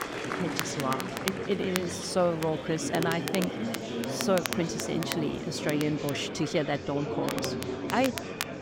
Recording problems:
murmuring crowd; loud; throughout; 4 dB below the speech
crackle, like an old record; loud; 7 dB below the speech
rain or running water; faint; until 6 s; 30 dB below the speech

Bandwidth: 16 kHz